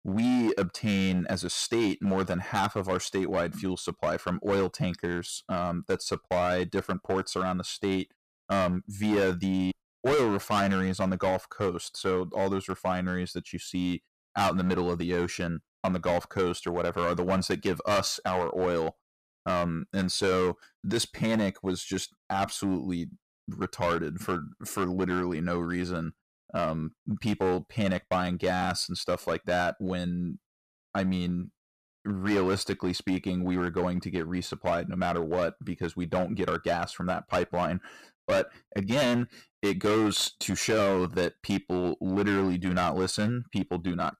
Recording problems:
distortion; heavy; 8% of the sound clipped

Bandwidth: 15 kHz